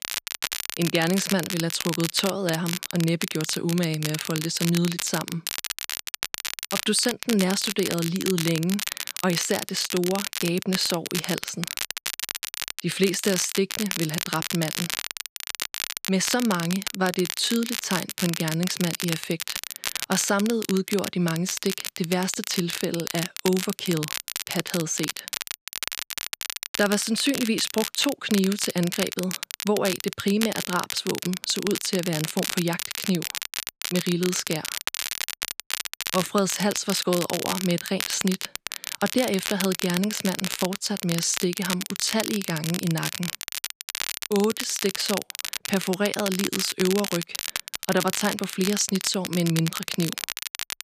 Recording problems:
crackle, like an old record; loud; 4 dB below the speech

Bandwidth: 14.5 kHz